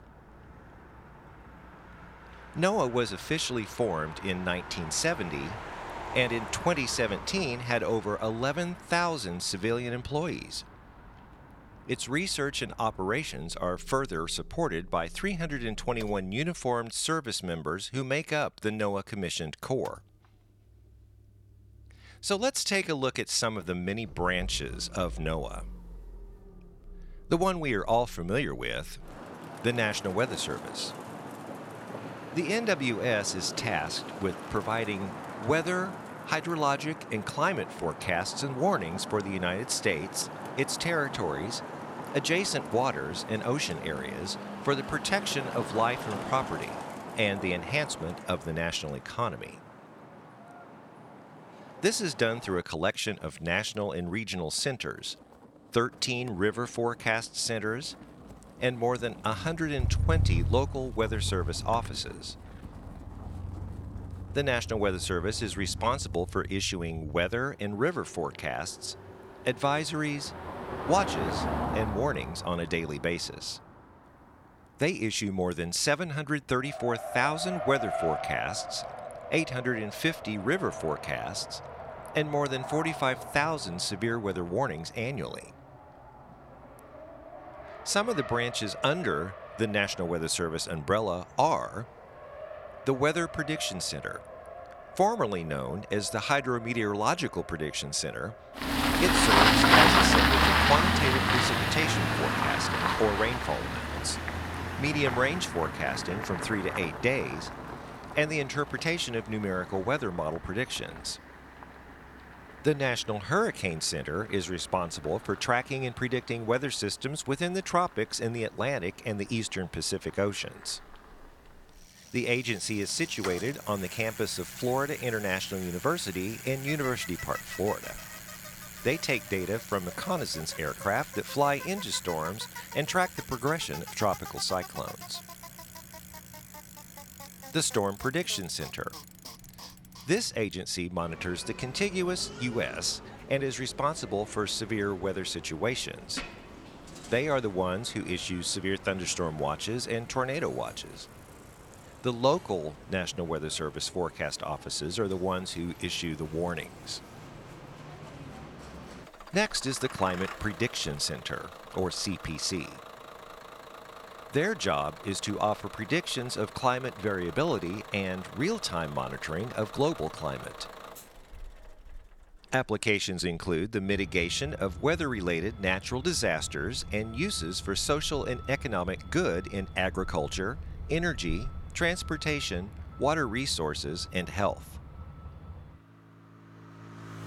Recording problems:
traffic noise; loud; throughout; 4 dB below the speech

